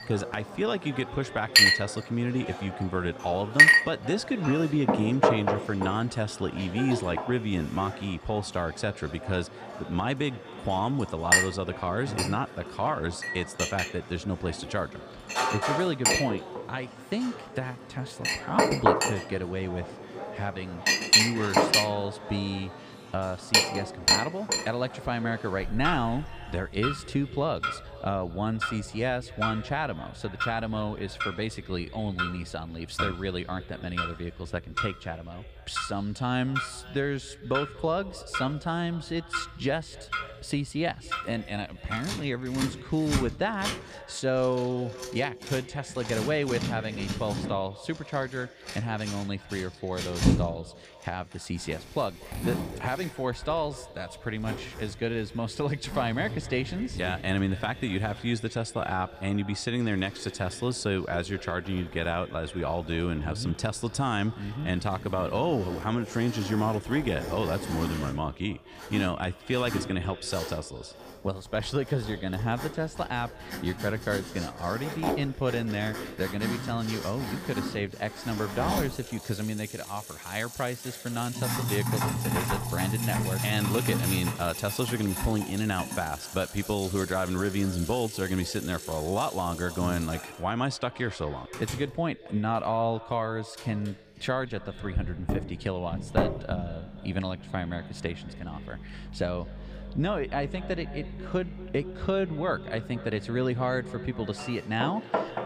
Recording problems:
echo of what is said; noticeable; throughout; 240 ms later, 15 dB below the speech
household noises; very loud; throughout; 2 dB above the speech

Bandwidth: 15 kHz